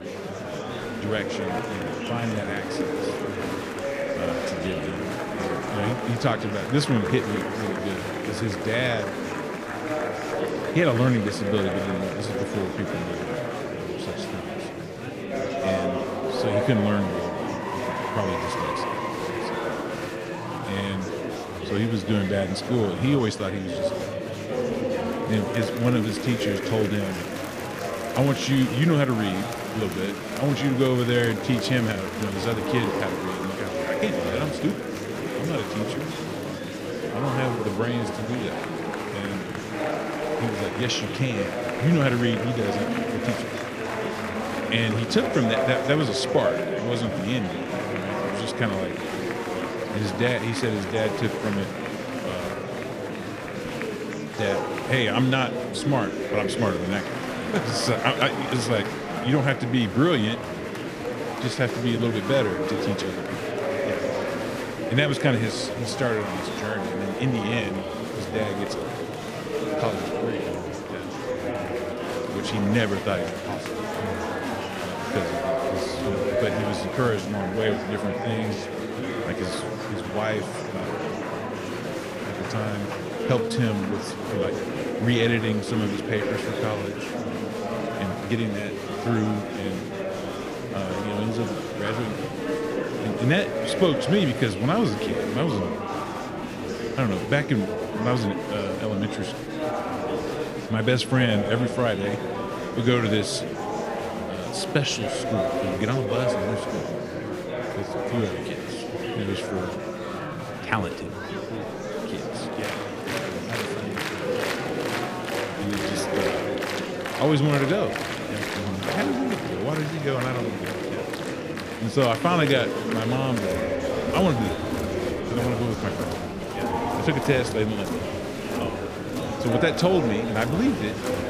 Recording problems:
murmuring crowd; loud; throughout; 2 dB below the speech

